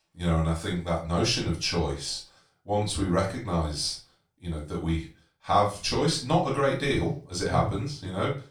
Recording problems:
off-mic speech; far
room echo; slight; dies away in 0.3 s

